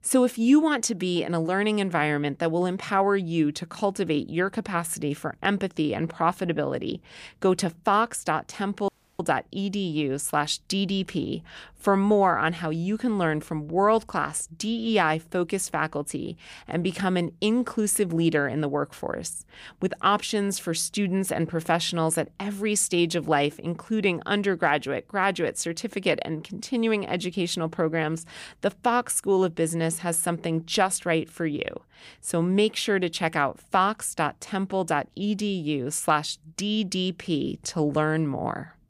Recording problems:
audio cutting out; at 9 s

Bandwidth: 15 kHz